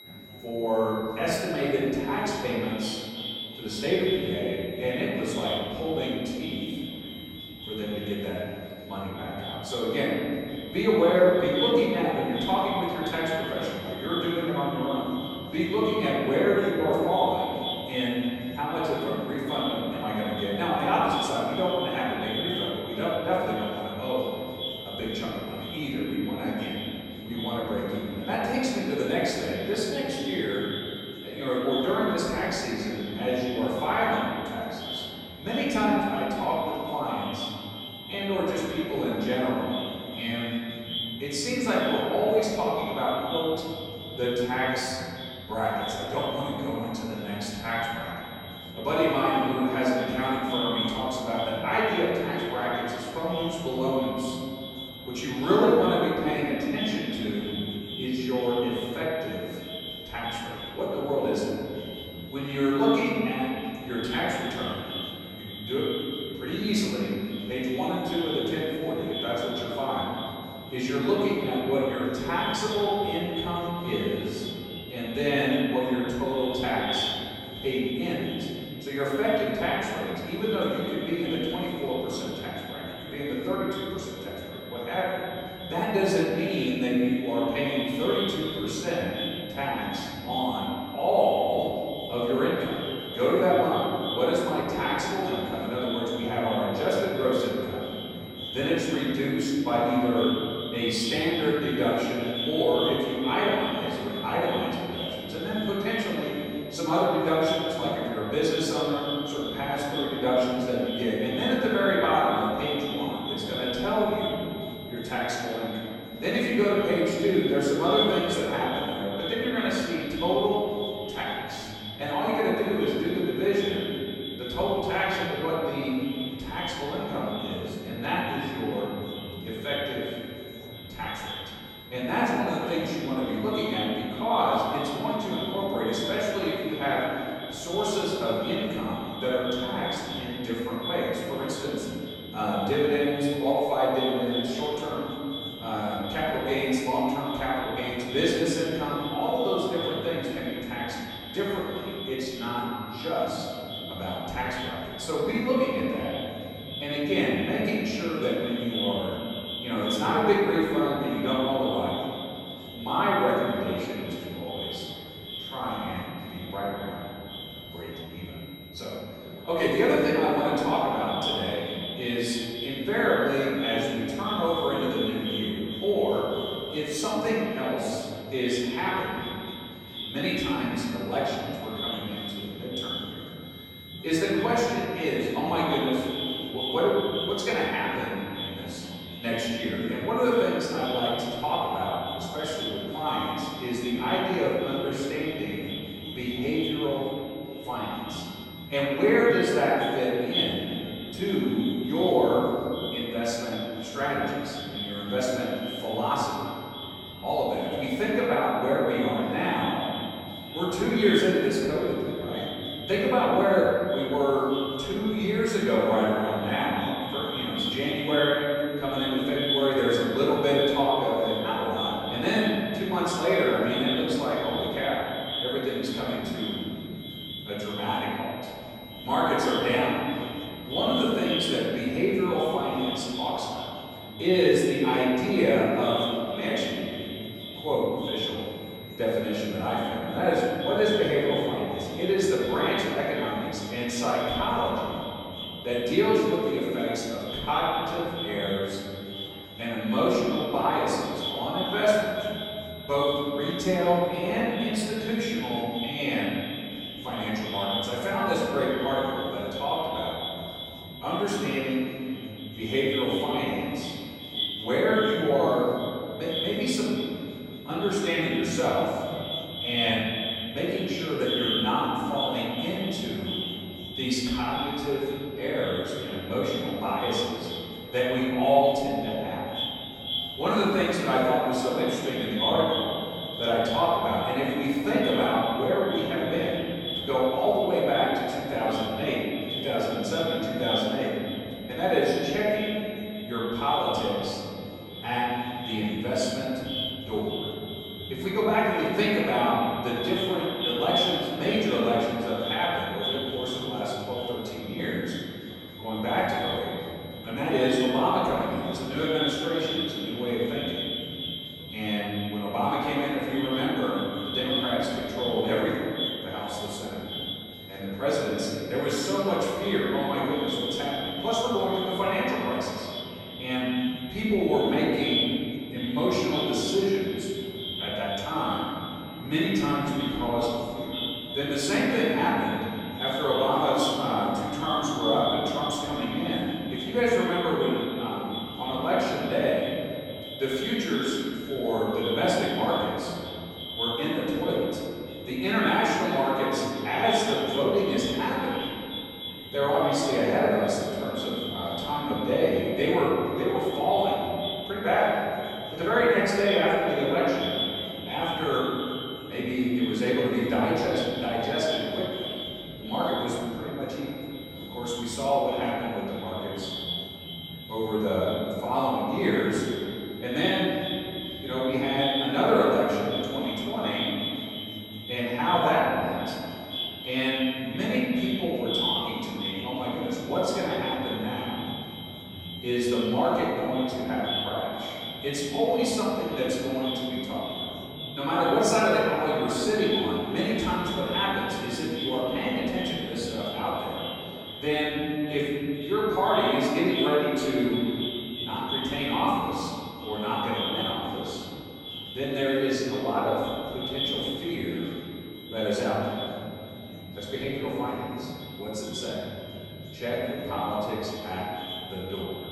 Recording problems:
echo of what is said; strong; throughout; 530 ms later, 9 dB below the speech
room echo; strong; dies away in 2.3 s
off-mic speech; far
high-pitched whine; noticeable; throughout; 4 kHz, 20 dB below the speech
chatter from many people; noticeable; throughout; 20 dB below the speech

